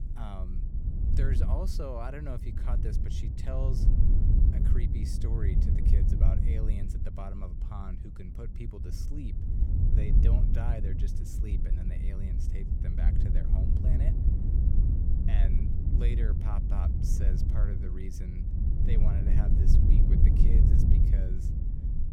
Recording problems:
wind noise on the microphone; heavy; 1 dB above the speech

